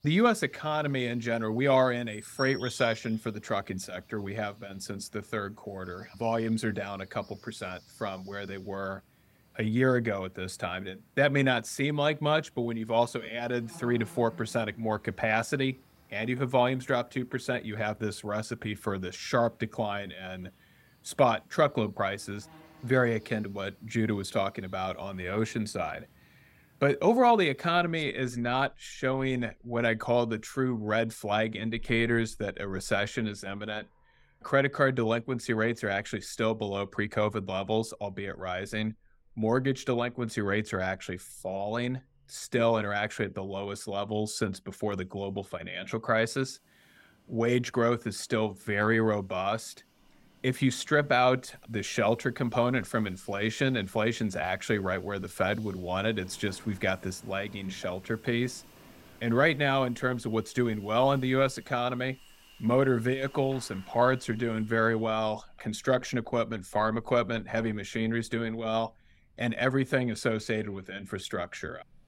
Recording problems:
animal sounds; faint; throughout; 25 dB below the speech

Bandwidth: 16 kHz